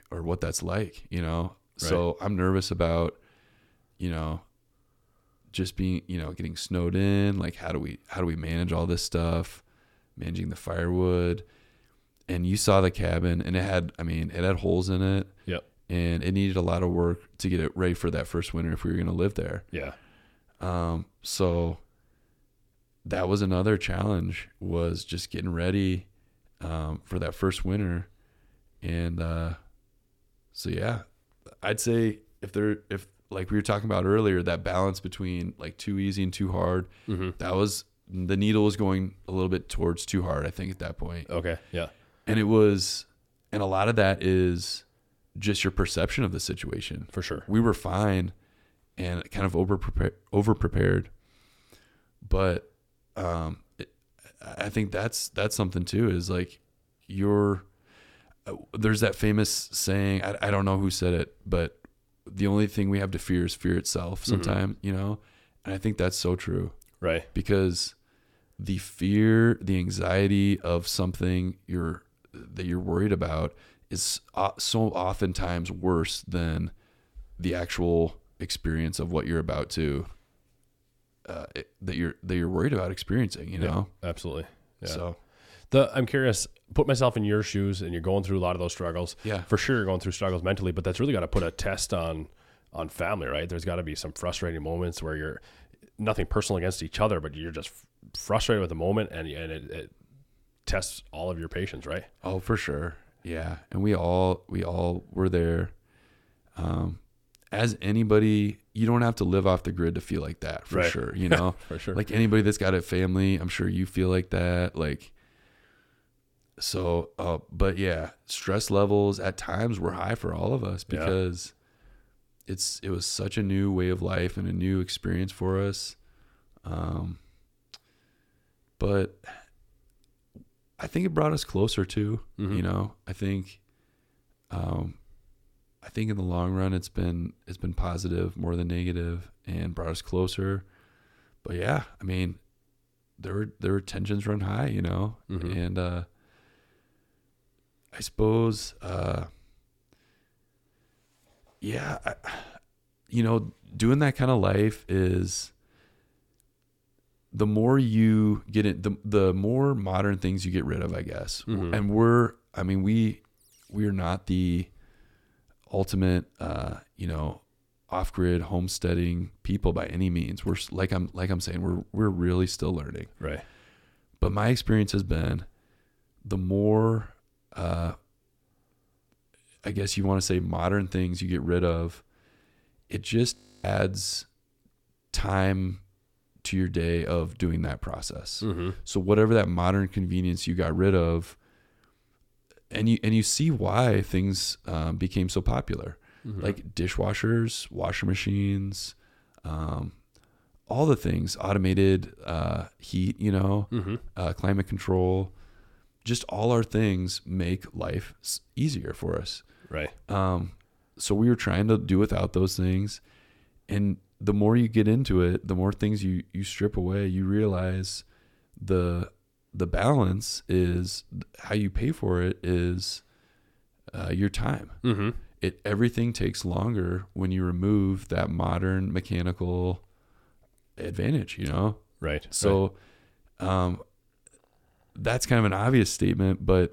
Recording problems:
audio freezing; at 3:03

